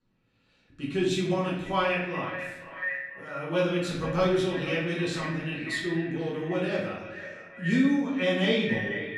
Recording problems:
echo of what is said; strong; throughout; 480 ms later, 9 dB below the speech
off-mic speech; far
room echo; noticeable; dies away in 0.8 s

